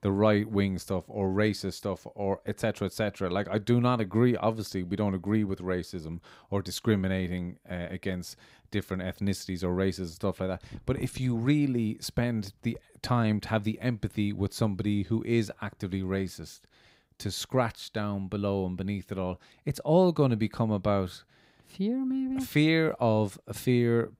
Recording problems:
none

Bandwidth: 15.5 kHz